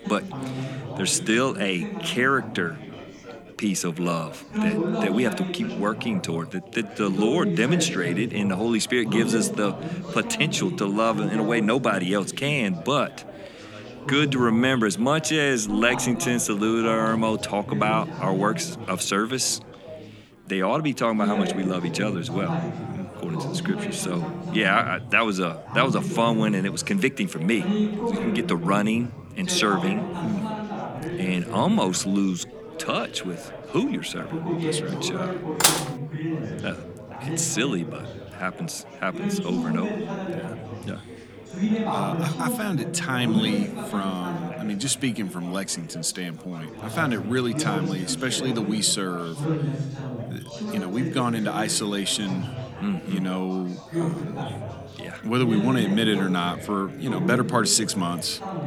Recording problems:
chatter from many people; loud; throughout; 6 dB below the speech
clattering dishes; loud; at 36 s; peak 6 dB above the speech

